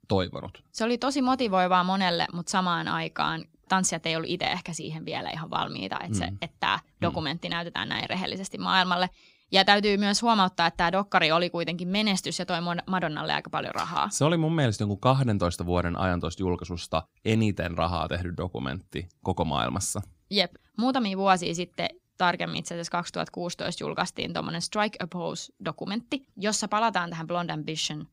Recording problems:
none

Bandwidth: 15.5 kHz